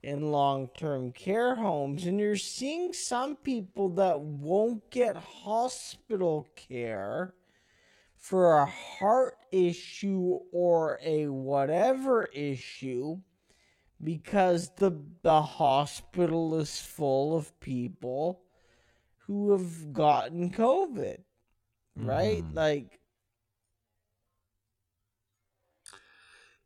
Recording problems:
wrong speed, natural pitch; too slow; 0.5 times normal speed

